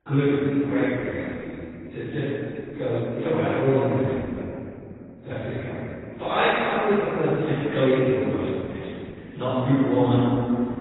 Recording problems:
room echo; strong; dies away in 2.5 s
off-mic speech; far
garbled, watery; badly; nothing above 4 kHz

